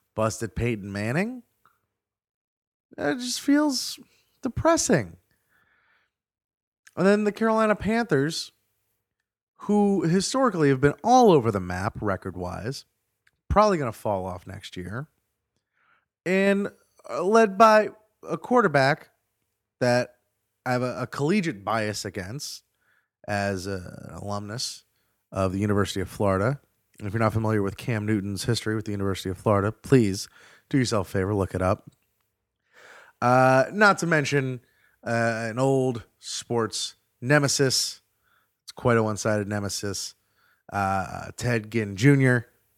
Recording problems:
none

